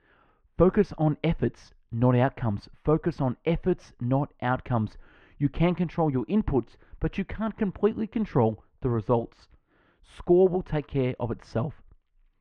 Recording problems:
muffled; very; fading above 2 kHz

